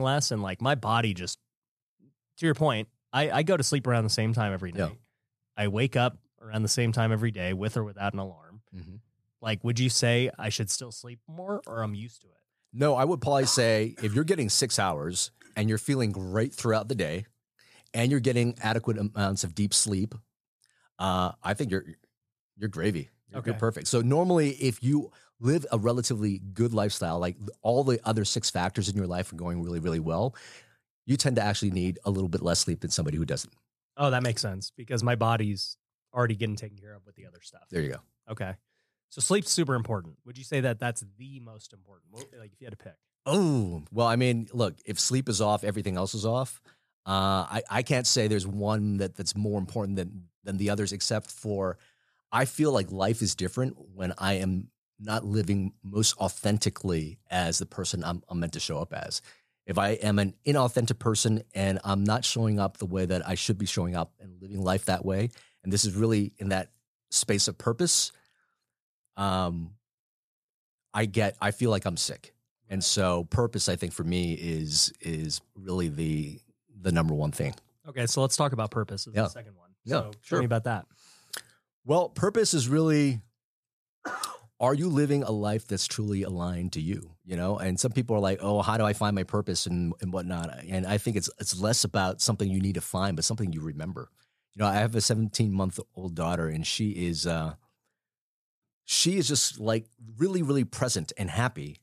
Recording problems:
abrupt cut into speech; at the start

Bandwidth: 14.5 kHz